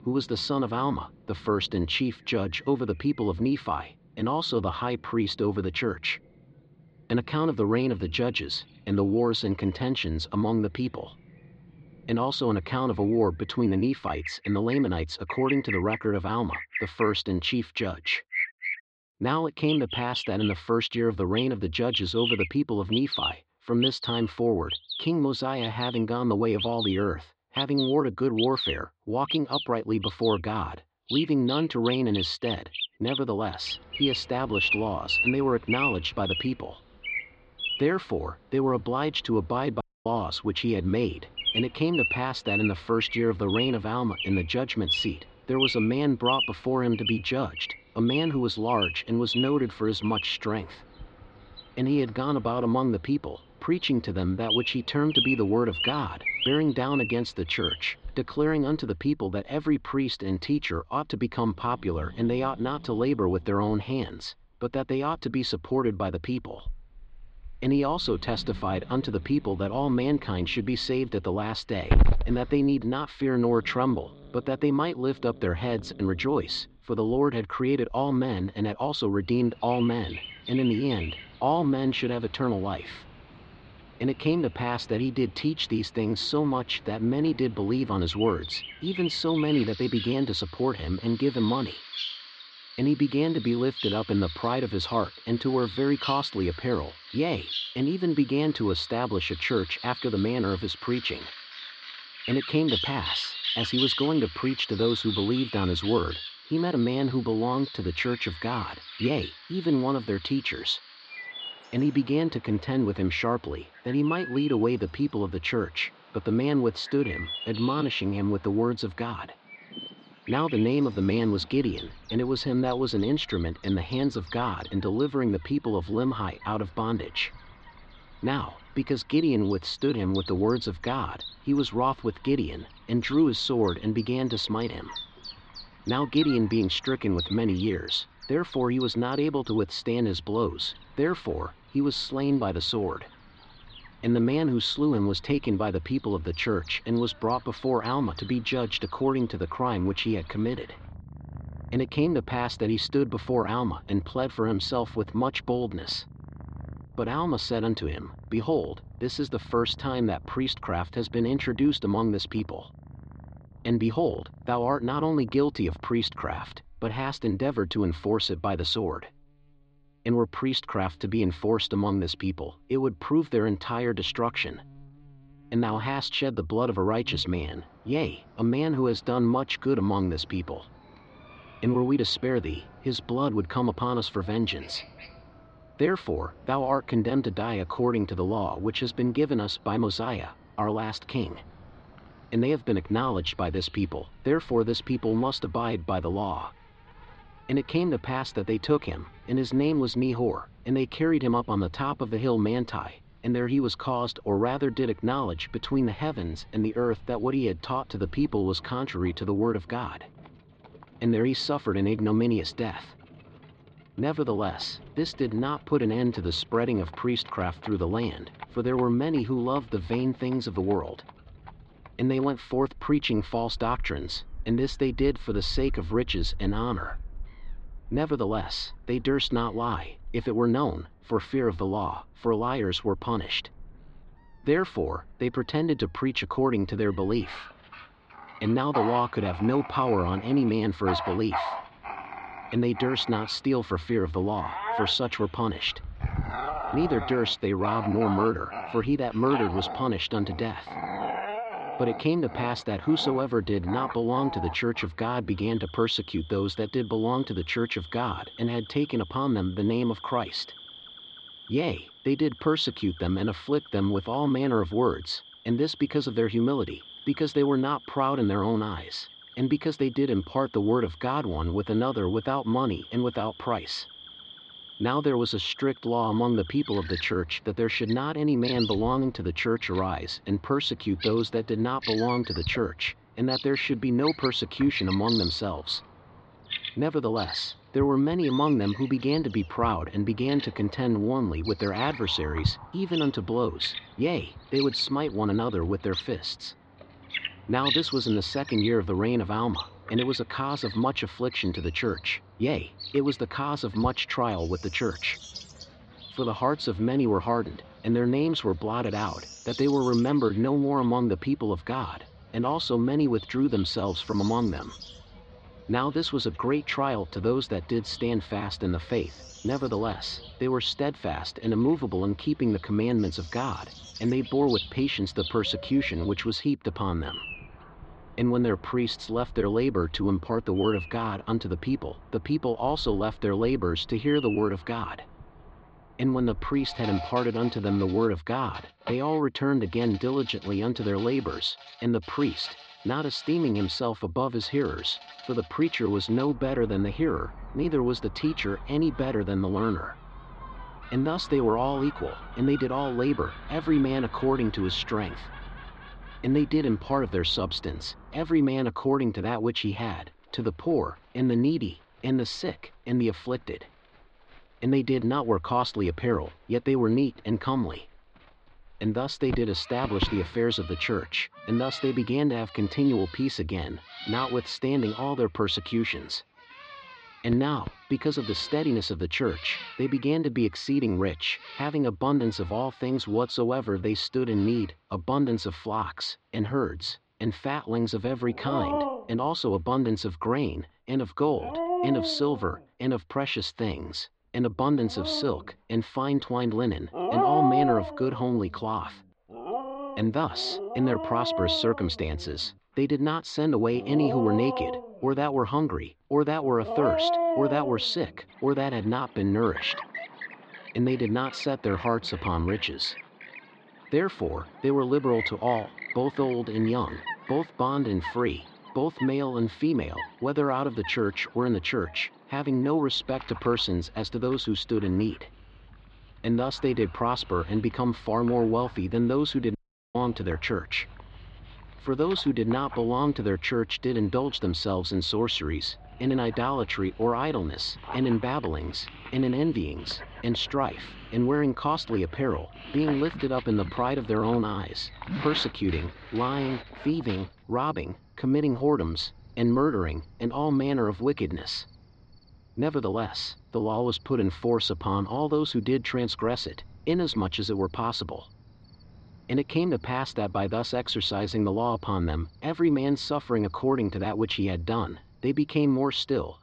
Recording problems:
muffled; slightly; fading above 4 kHz
animal sounds; loud; throughout; 9 dB below the speech
audio cutting out; at 40 s and at 7:10

